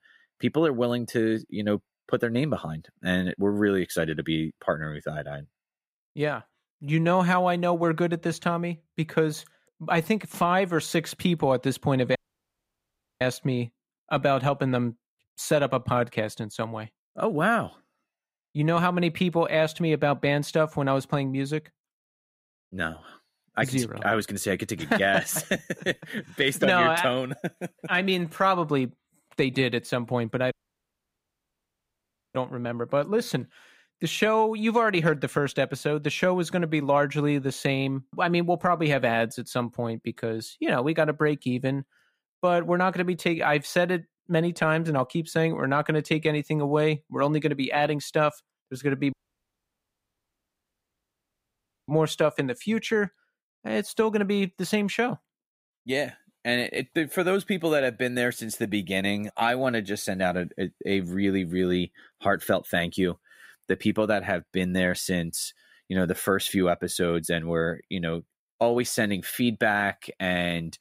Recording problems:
audio cutting out; at 12 s for 1 s, at 31 s for 2 s and at 49 s for 3 s

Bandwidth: 15.5 kHz